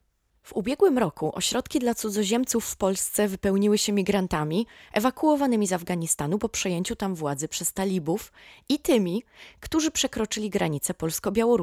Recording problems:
abrupt cut into speech; at the end

